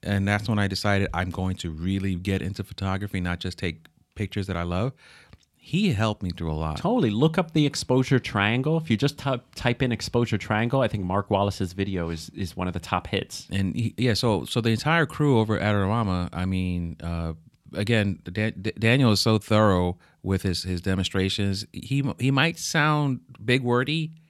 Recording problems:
none

